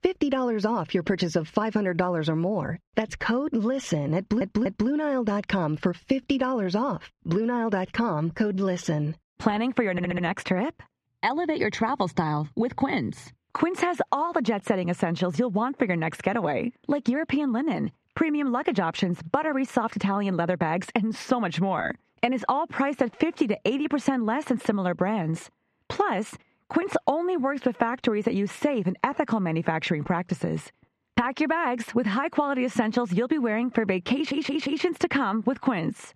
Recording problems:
muffled; very slightly; fading above 2.5 kHz
squashed, flat; somewhat
audio stuttering; at 4 s, at 10 s and at 34 s

